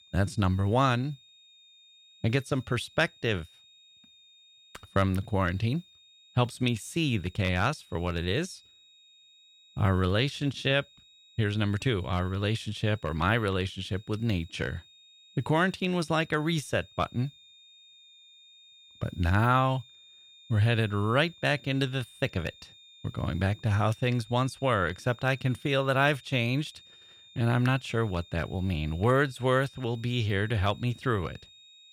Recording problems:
high-pitched whine; faint; throughout; 3.5 kHz, 25 dB below the speech

